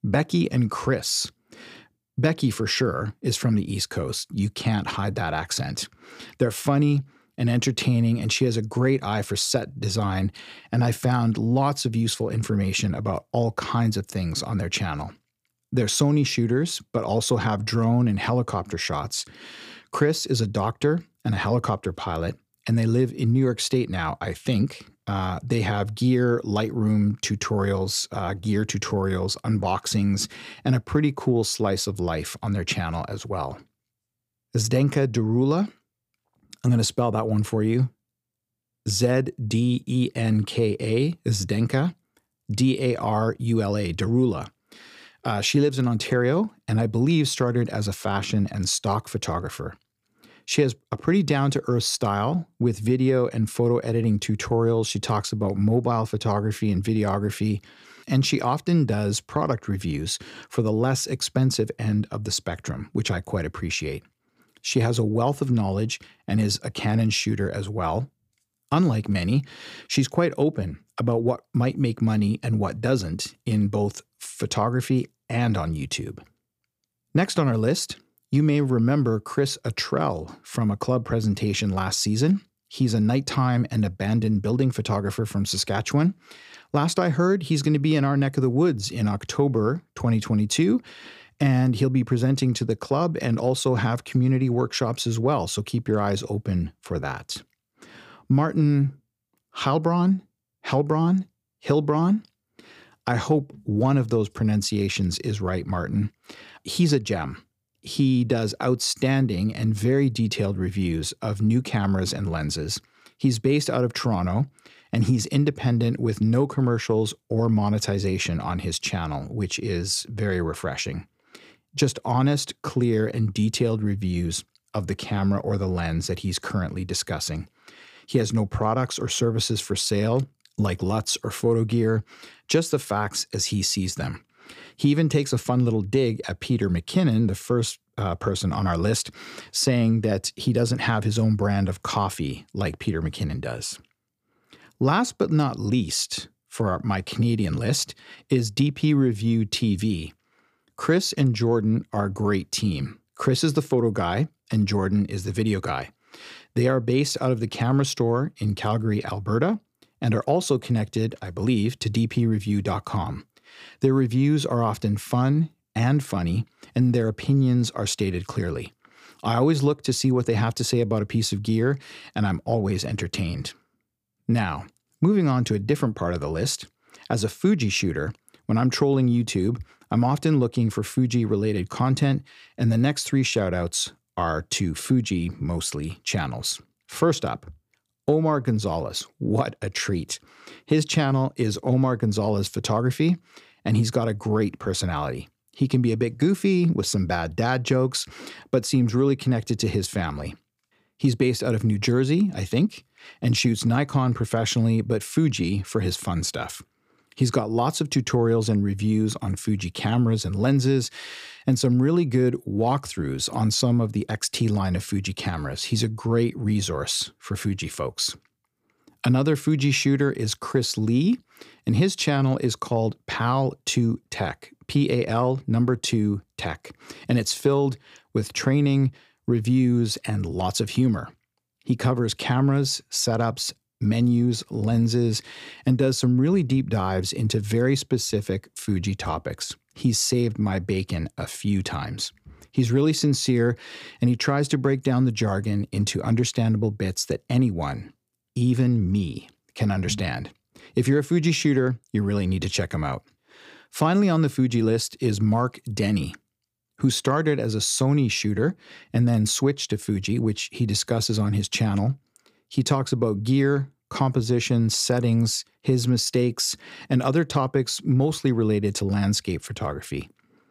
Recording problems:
none

